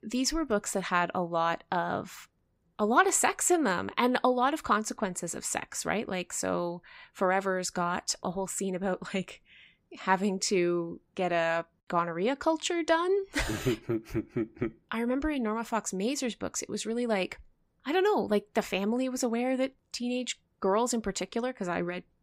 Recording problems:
none

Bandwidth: 15.5 kHz